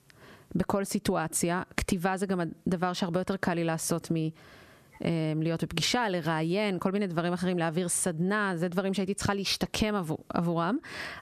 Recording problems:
squashed, flat; somewhat

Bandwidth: 13.5 kHz